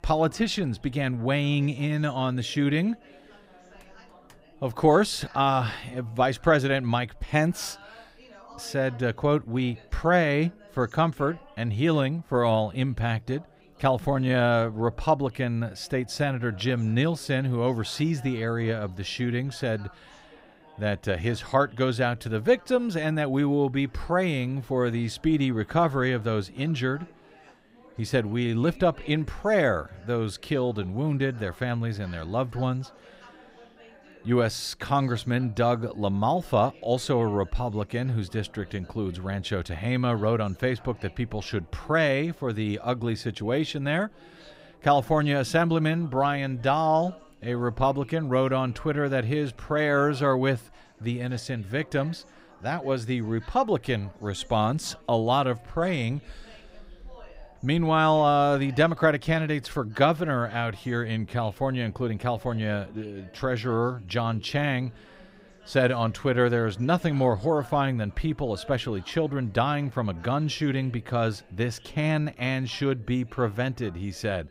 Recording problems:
background chatter; faint; throughout; 4 voices, 25 dB below the speech

